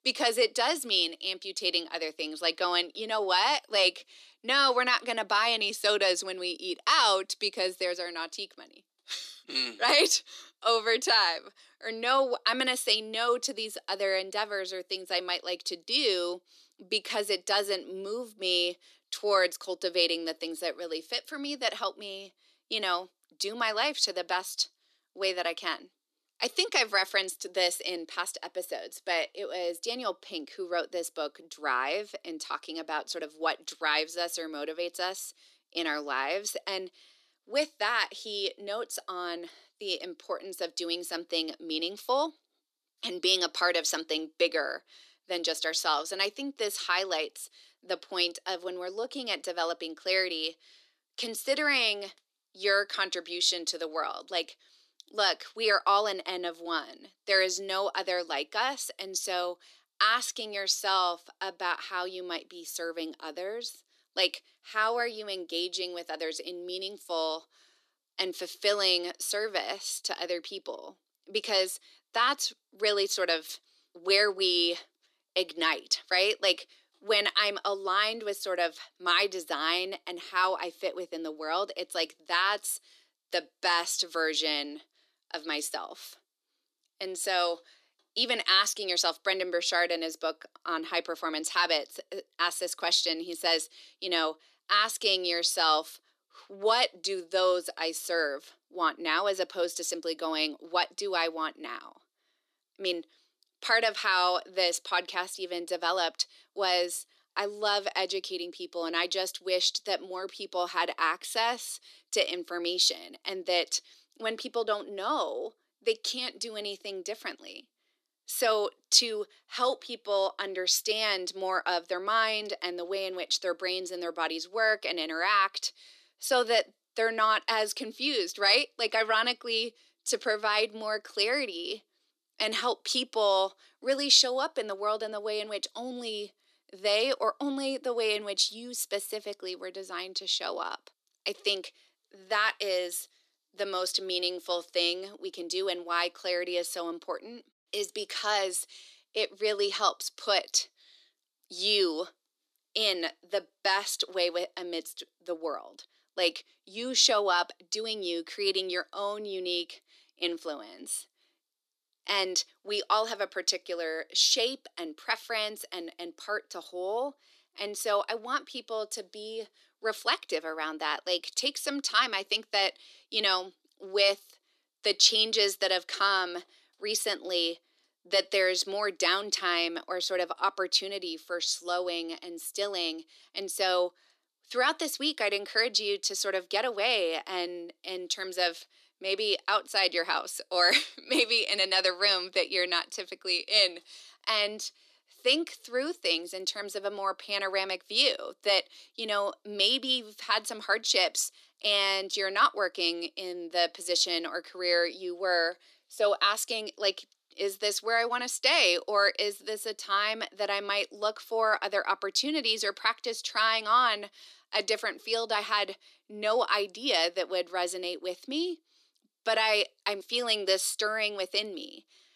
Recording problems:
thin; very; fading below 300 Hz

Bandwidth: 13.5 kHz